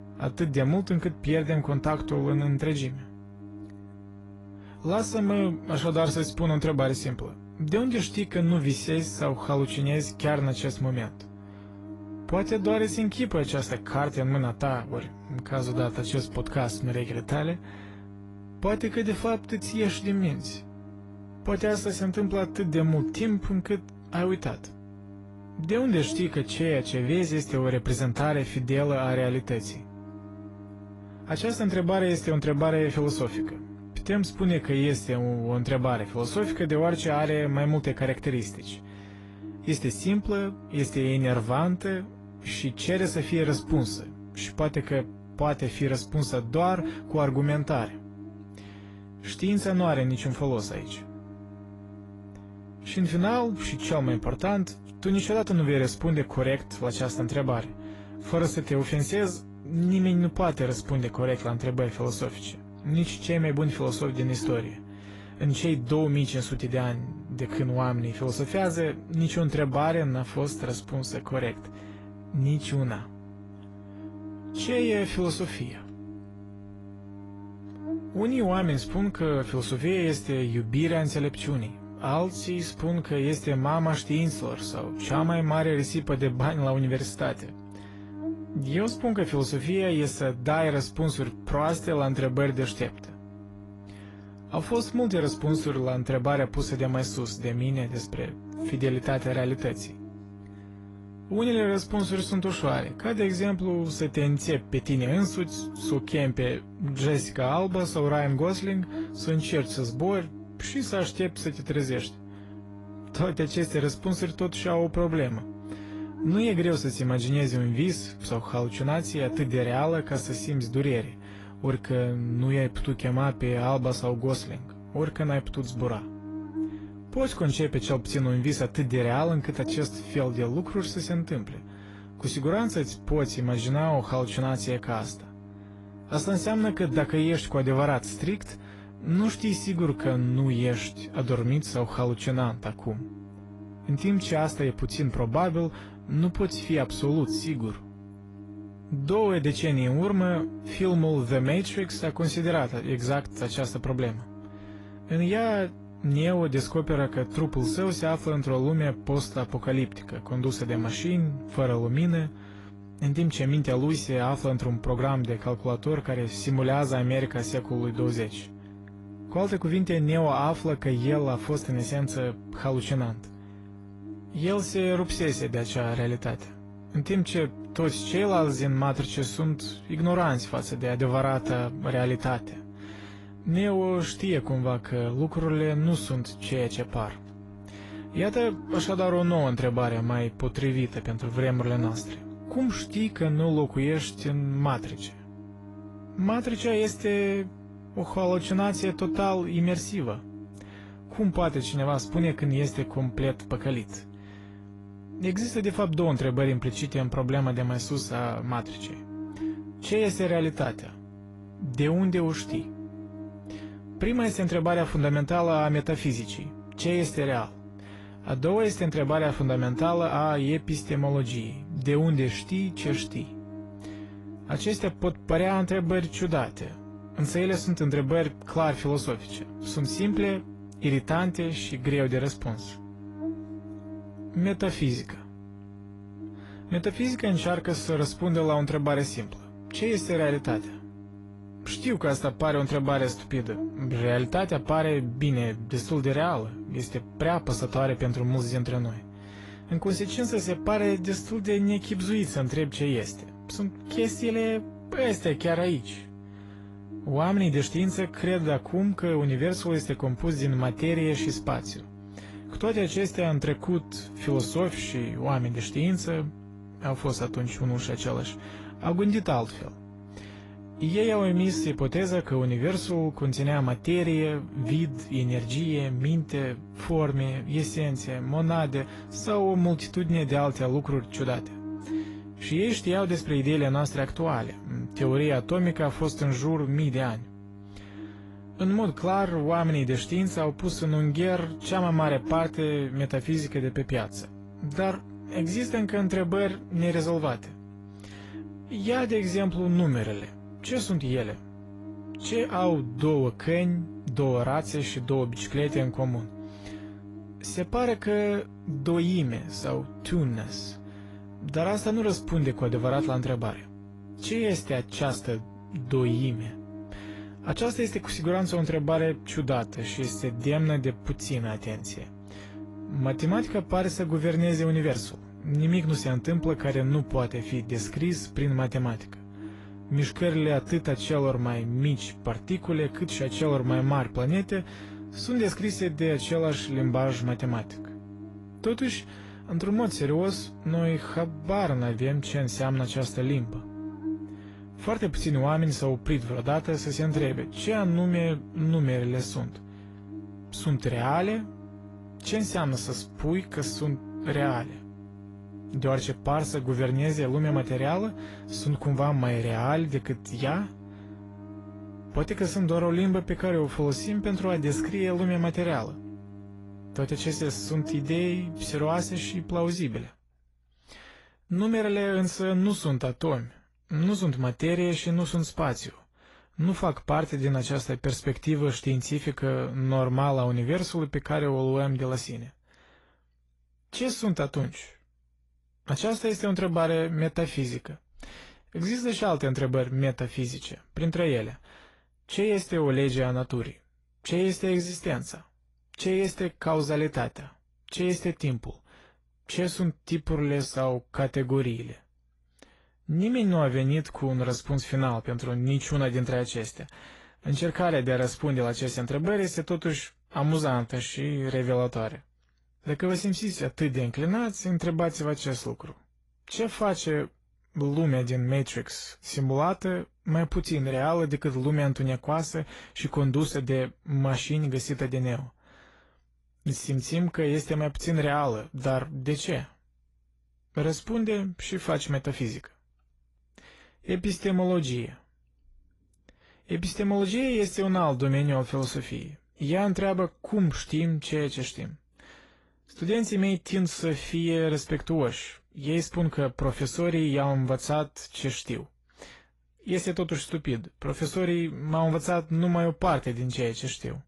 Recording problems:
garbled, watery; slightly; nothing above 11 kHz
electrical hum; noticeable; until 6:10; 50 Hz, 15 dB below the speech

